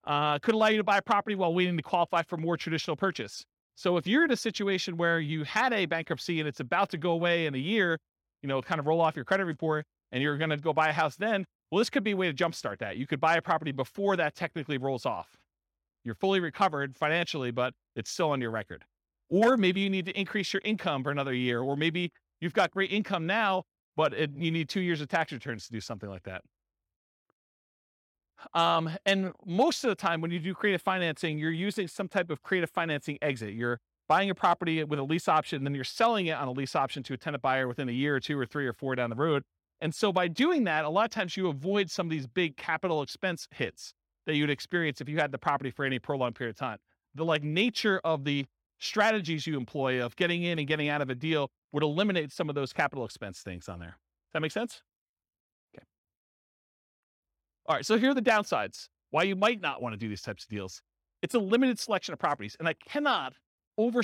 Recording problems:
abrupt cut into speech; at the end

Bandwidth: 16.5 kHz